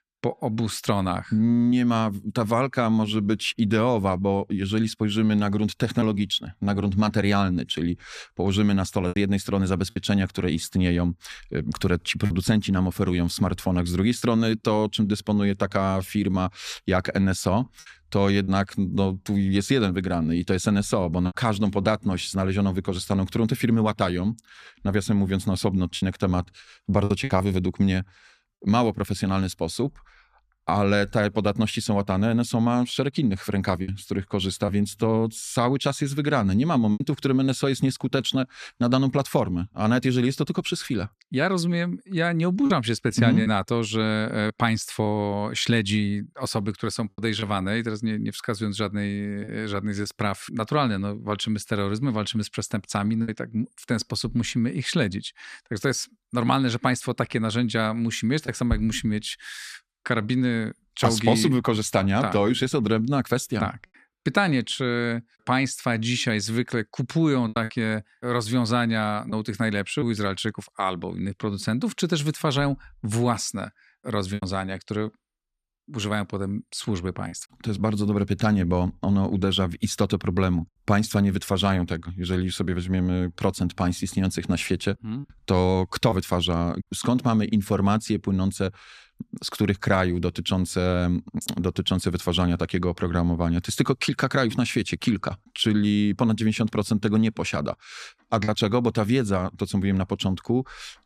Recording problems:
choppy; occasionally; 2% of the speech affected

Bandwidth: 14.5 kHz